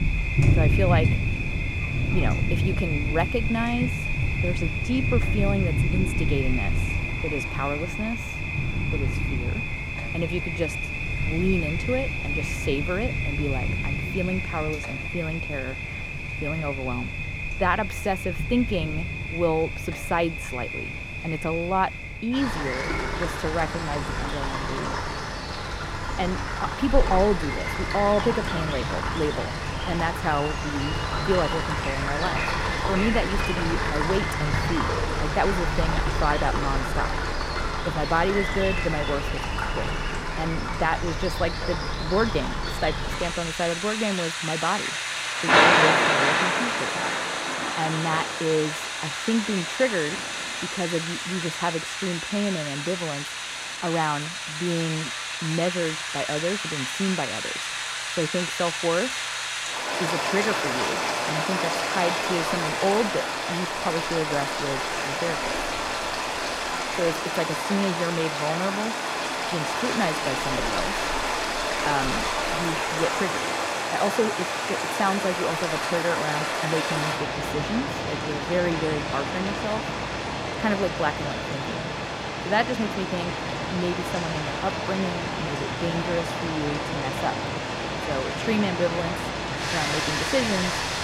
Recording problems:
rain or running water; very loud; throughout; 2 dB above the speech

